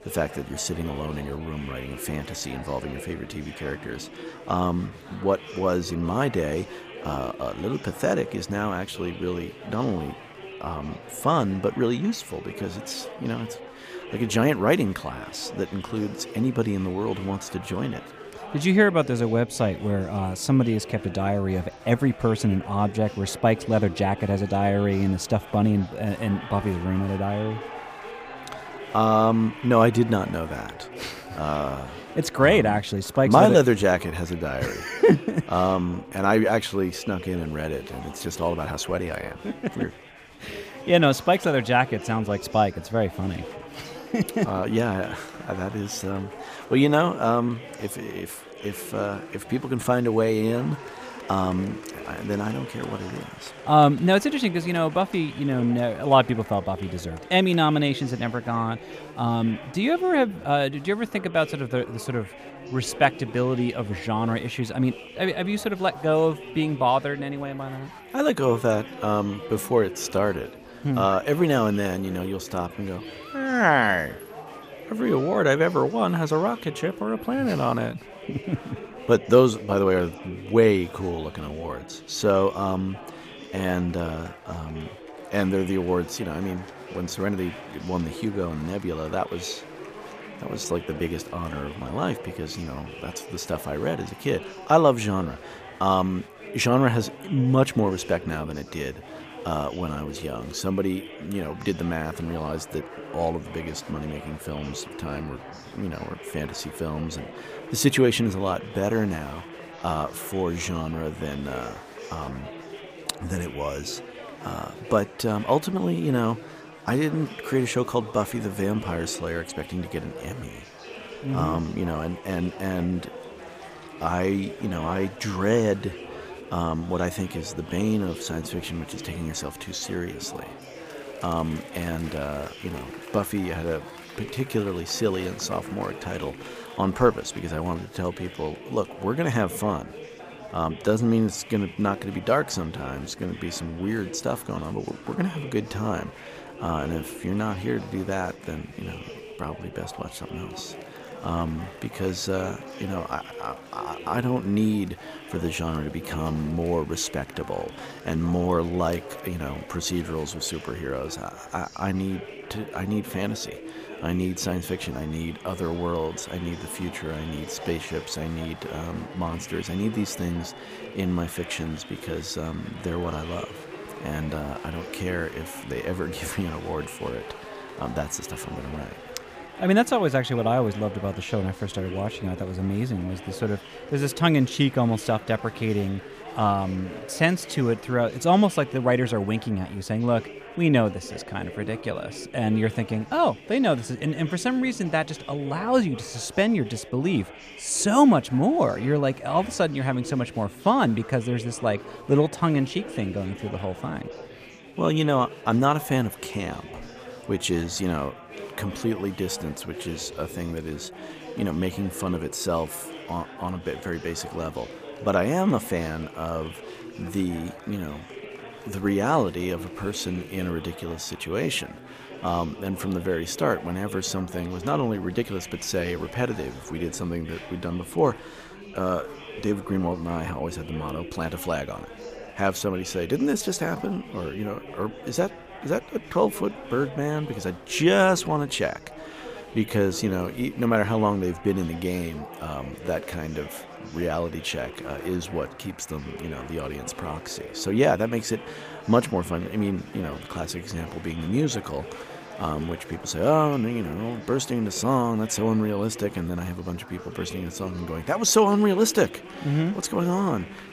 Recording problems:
chatter from many people; noticeable; throughout; 15 dB below the speech

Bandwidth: 15 kHz